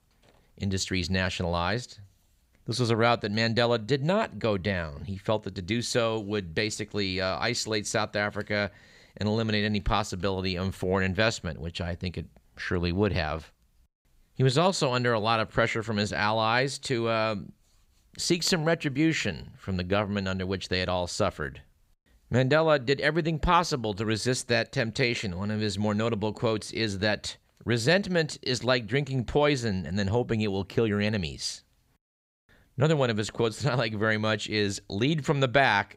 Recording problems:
none

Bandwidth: 15.5 kHz